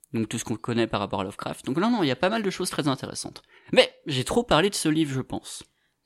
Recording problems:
none

